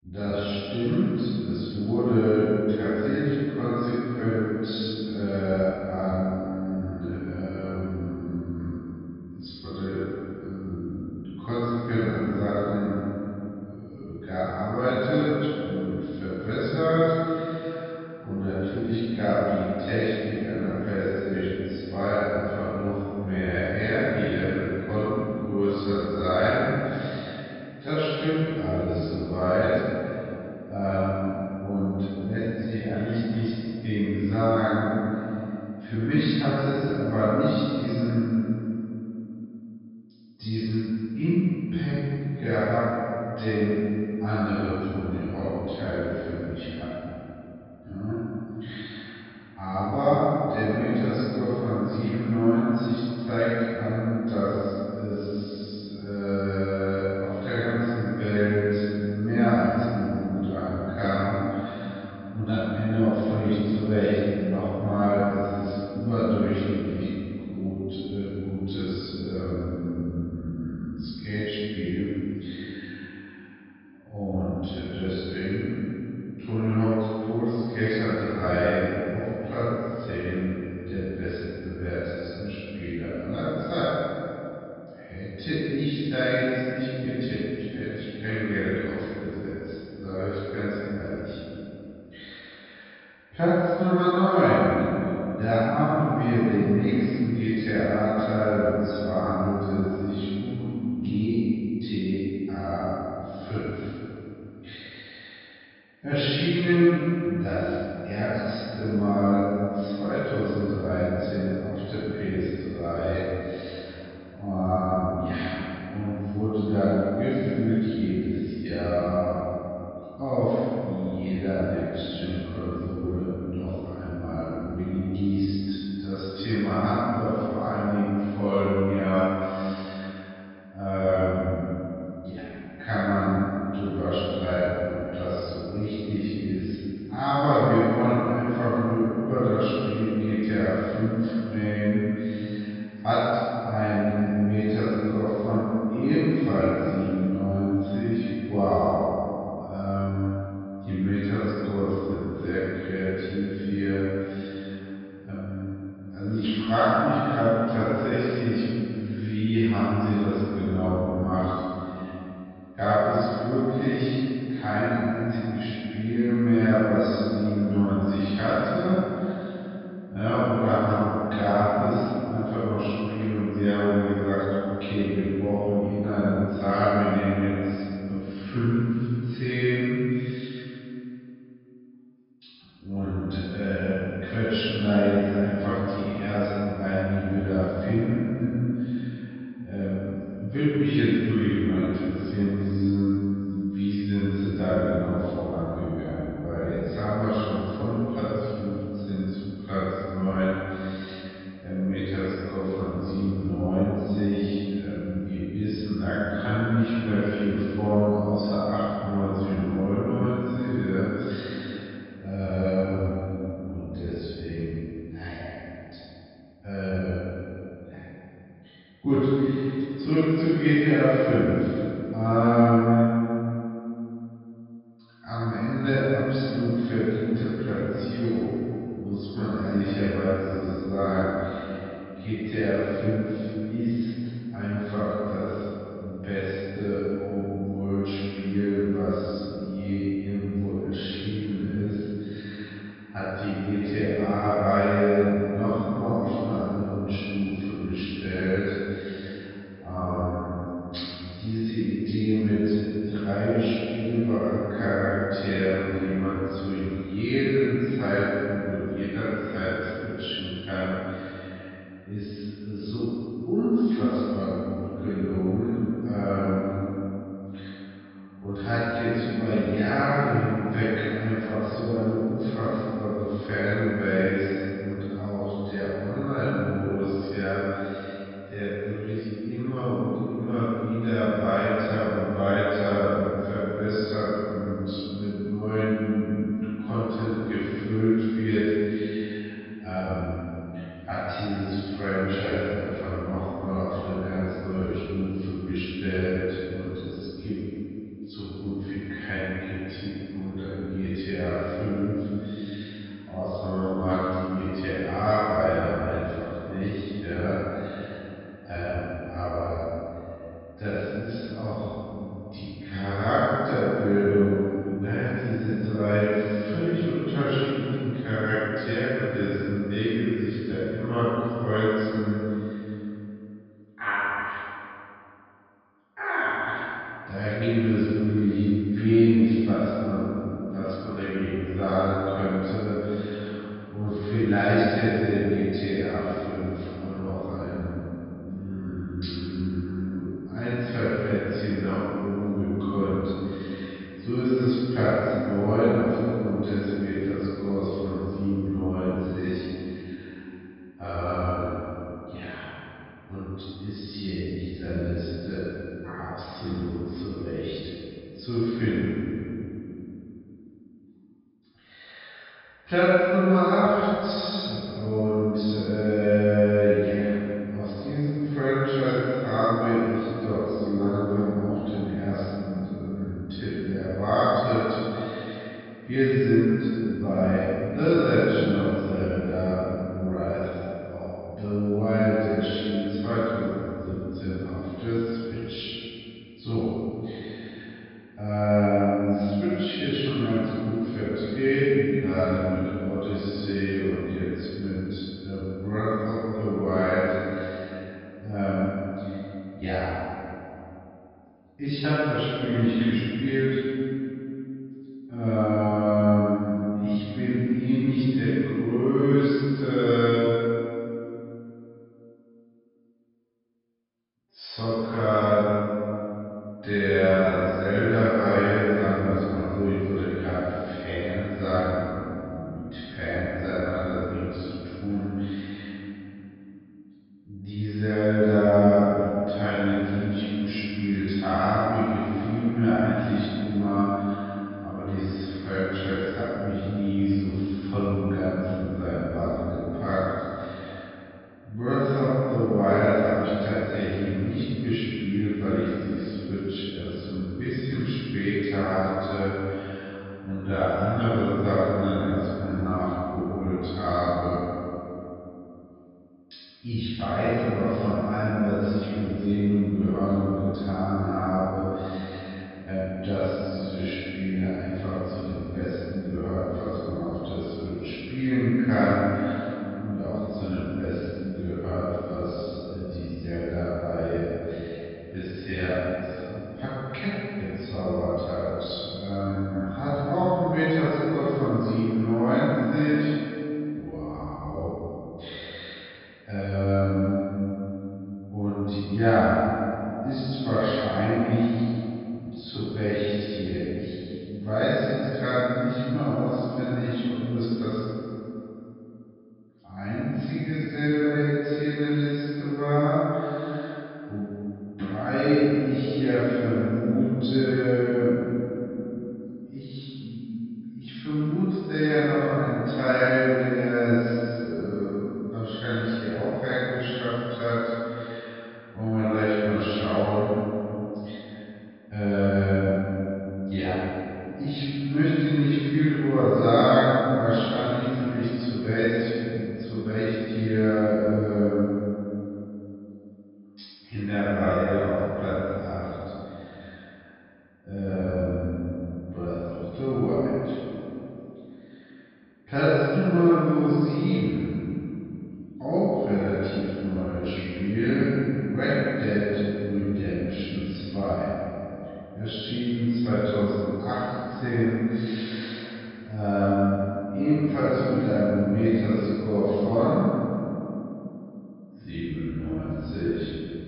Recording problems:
room echo; strong; dies away in 2.9 s
off-mic speech; far
wrong speed, natural pitch; too slow; 0.5 times normal speed
high frequencies cut off; noticeable; nothing above 5.5 kHz
echo of what is said; faint; throughout; 170 ms later, 20 dB below the speech

